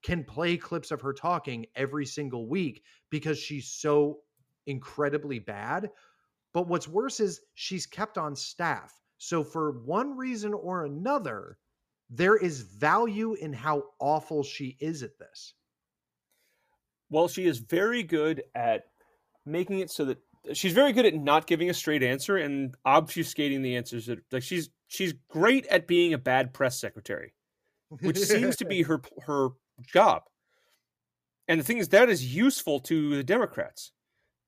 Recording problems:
none

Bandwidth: 15 kHz